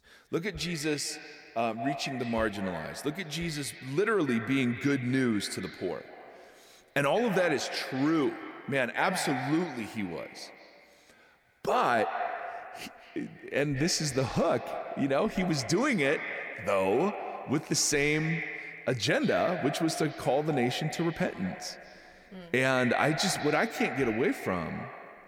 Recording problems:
echo of what is said; strong; throughout; 190 ms later, 9 dB below the speech

